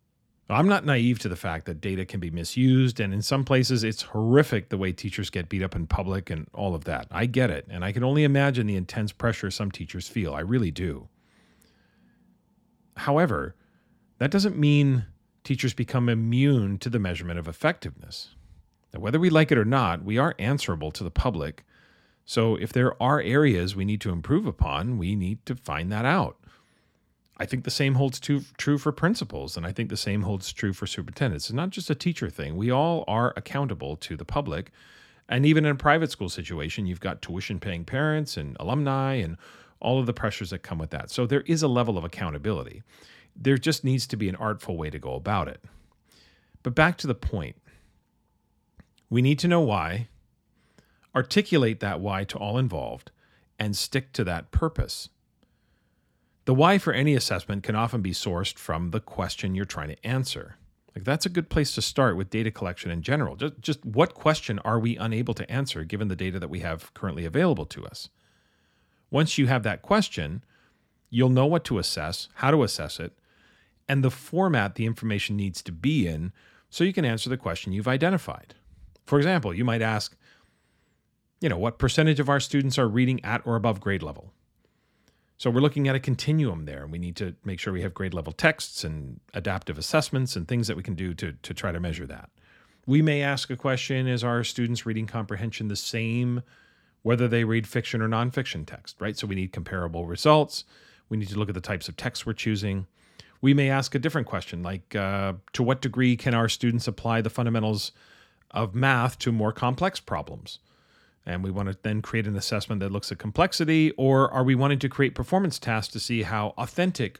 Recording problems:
none

